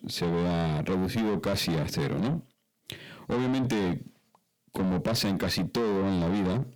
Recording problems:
distortion; heavy; 7 dB below the speech

